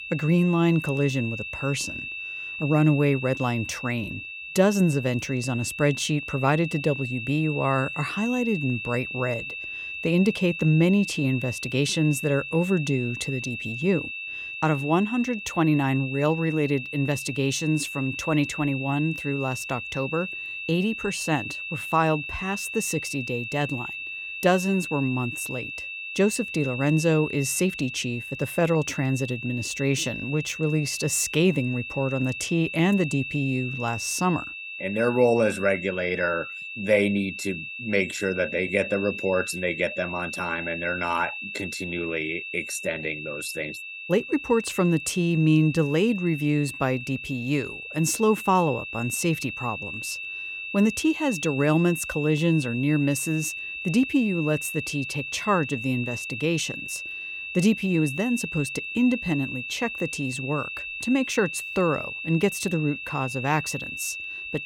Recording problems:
high-pitched whine; loud; throughout; 2.5 kHz, 7 dB below the speech

